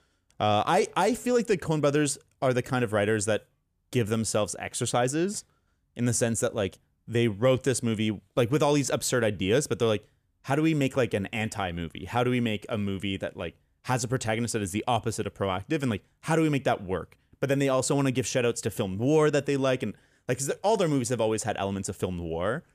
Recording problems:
none

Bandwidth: 14.5 kHz